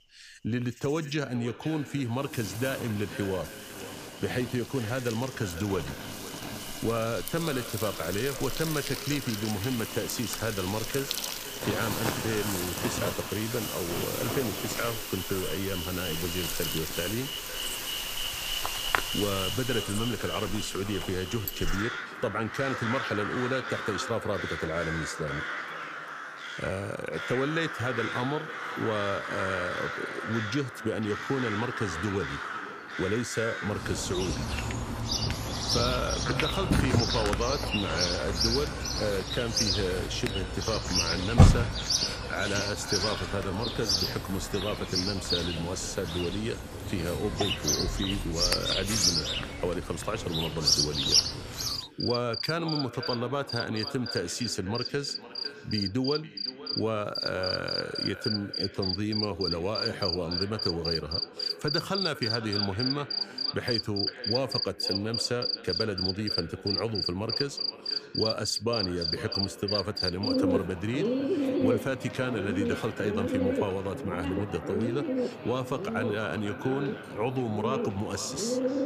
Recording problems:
echo of what is said; noticeable; throughout; 500 ms later, 15 dB below the speech
animal sounds; very loud; throughout; 1 dB above the speech

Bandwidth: 15 kHz